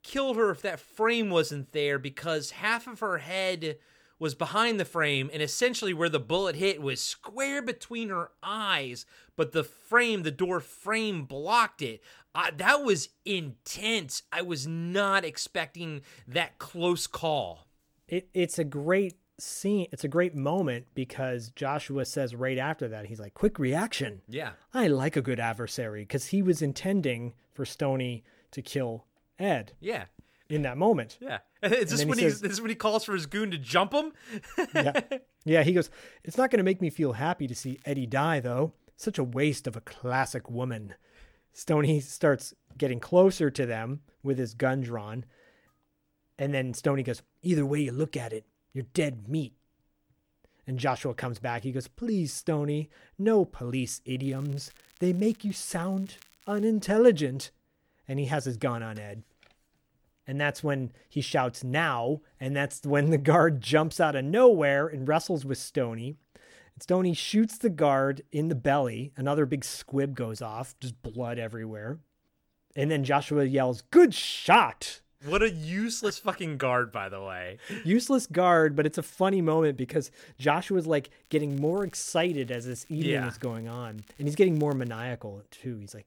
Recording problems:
crackling; faint; at 38 s, from 54 to 57 s and from 1:21 to 1:25; 30 dB below the speech

